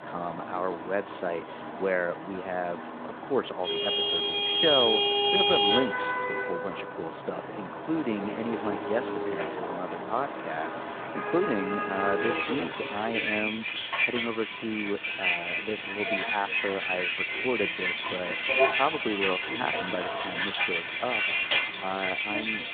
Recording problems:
phone-call audio; nothing above 3.5 kHz
traffic noise; very loud; throughout; 5 dB above the speech

